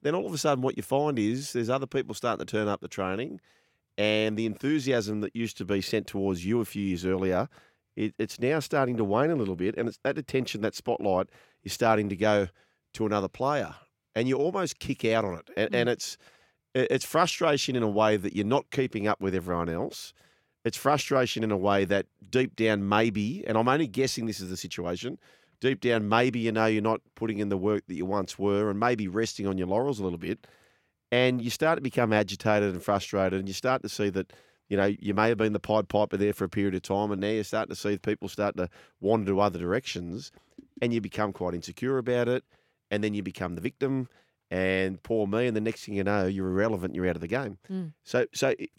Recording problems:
none

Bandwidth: 16.5 kHz